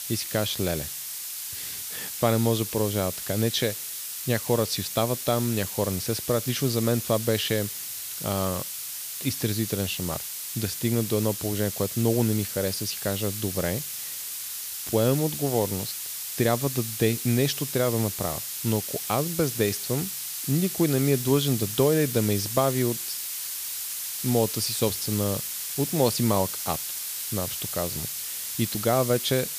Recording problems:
hiss; loud; throughout; 4 dB below the speech

